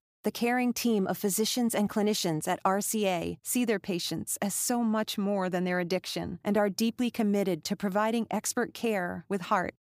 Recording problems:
none

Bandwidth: 15 kHz